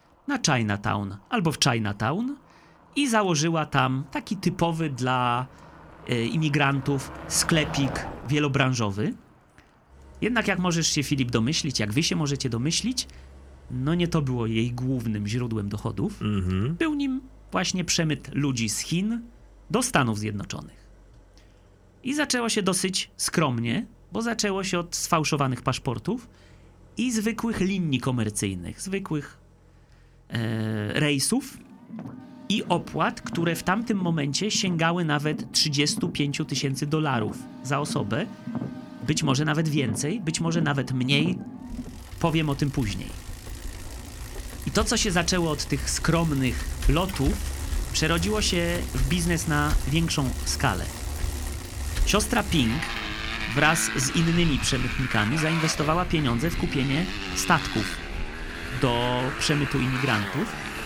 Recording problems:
traffic noise; loud; throughout; 8 dB below the speech

